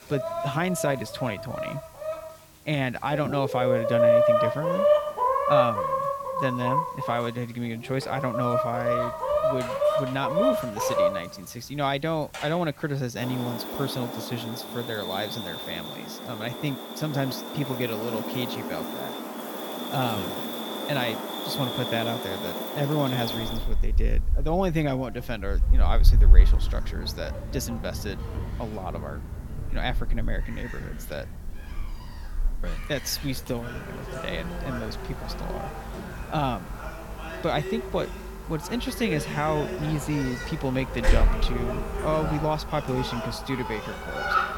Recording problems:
animal sounds; very loud; throughout; 1 dB above the speech
hiss; faint; throughout; 25 dB below the speech

